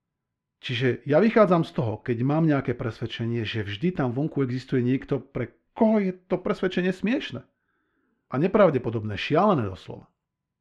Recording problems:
muffled; slightly; fading above 2.5 kHz

